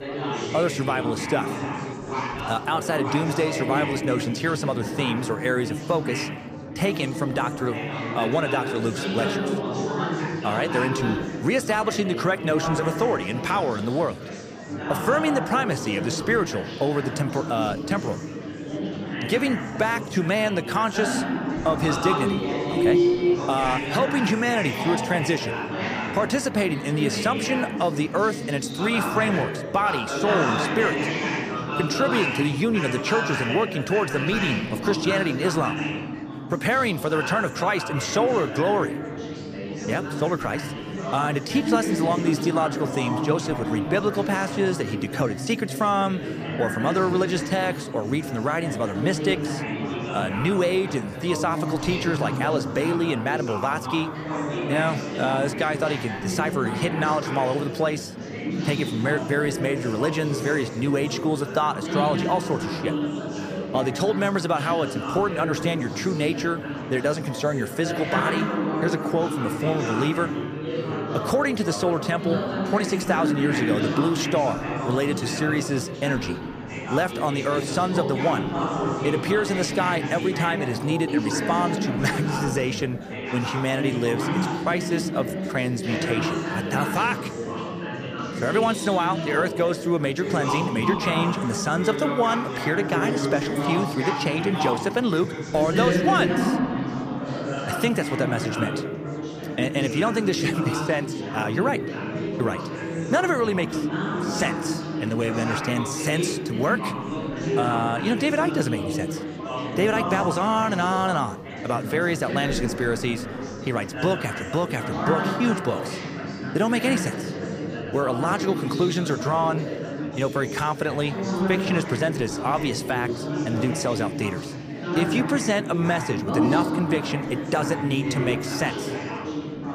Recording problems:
chatter from many people; loud; throughout; 3 dB below the speech

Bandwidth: 15 kHz